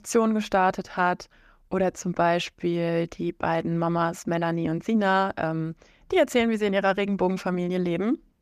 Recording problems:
none

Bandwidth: 14.5 kHz